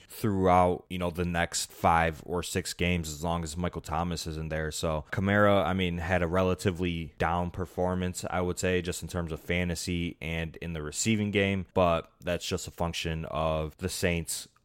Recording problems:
none

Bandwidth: 16 kHz